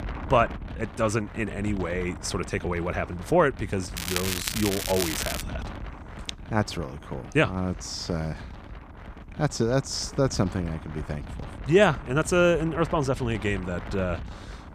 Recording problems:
crackling; loud; from 4 to 5.5 s; 3 dB below the speech
wind noise on the microphone; occasional gusts; 15 dB below the speech

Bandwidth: 15 kHz